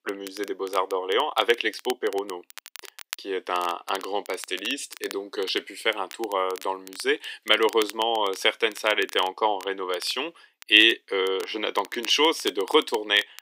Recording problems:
thin; somewhat; fading below 300 Hz
crackle, like an old record; noticeable; 20 dB below the speech

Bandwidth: 15.5 kHz